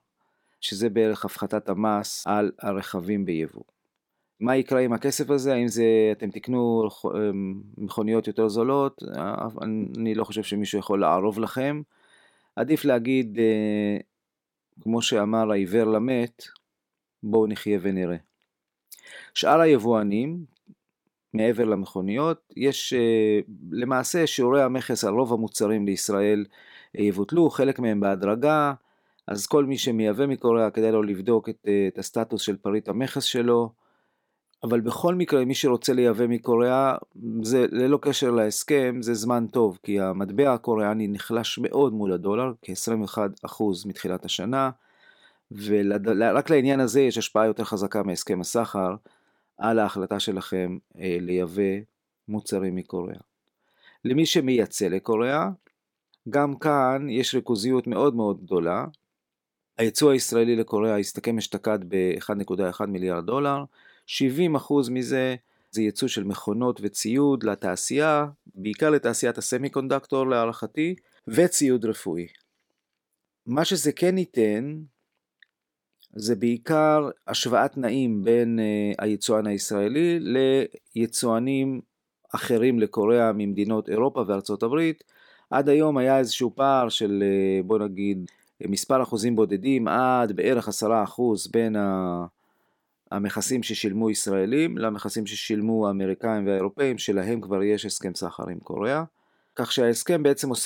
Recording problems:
abrupt cut into speech; at the end

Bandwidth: 17 kHz